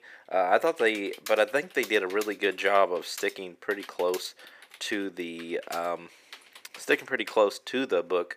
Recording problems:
thin; somewhat; fading below 350 Hz
keyboard typing; faint; from 0.5 to 7.5 s; peak 15 dB below the speech

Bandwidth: 15 kHz